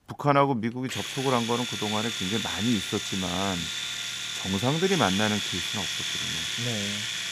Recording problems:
household noises; loud; throughout; 1 dB below the speech

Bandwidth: 15.5 kHz